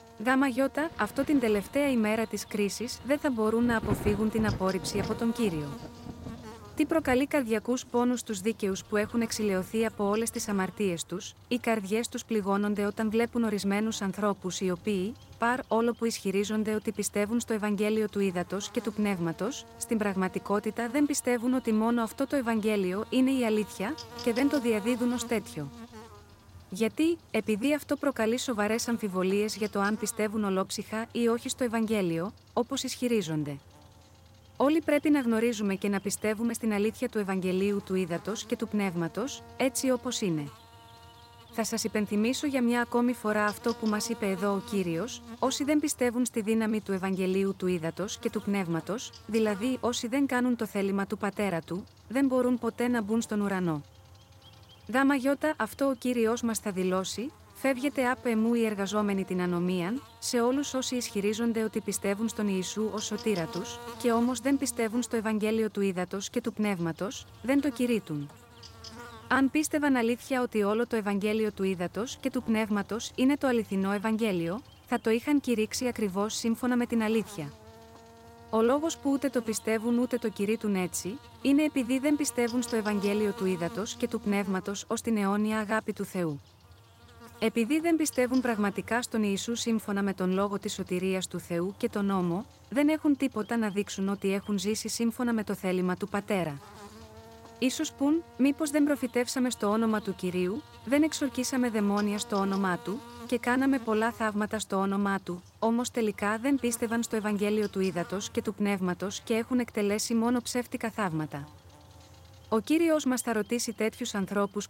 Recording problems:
electrical hum; noticeable; throughout; 60 Hz, 20 dB below the speech
rain or running water; noticeable; throughout; 15 dB below the speech

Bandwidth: 16 kHz